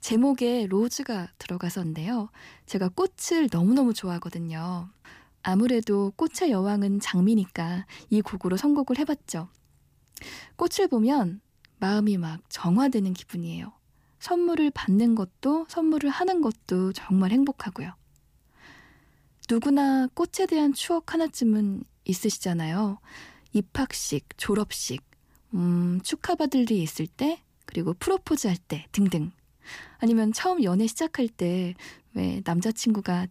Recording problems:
none

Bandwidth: 15 kHz